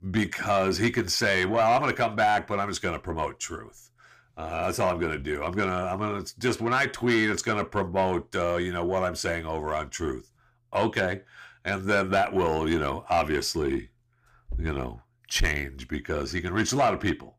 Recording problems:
distortion; slight; 10 dB below the speech

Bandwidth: 15 kHz